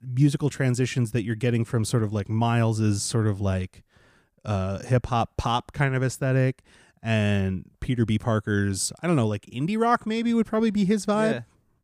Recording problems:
none

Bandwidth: 15 kHz